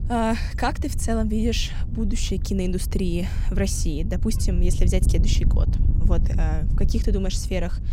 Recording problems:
wind noise on the microphone; occasional gusts; 10 dB below the speech

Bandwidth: 16 kHz